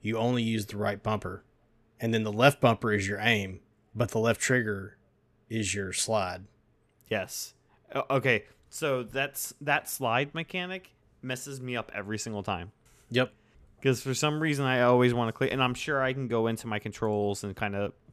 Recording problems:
none

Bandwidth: 14 kHz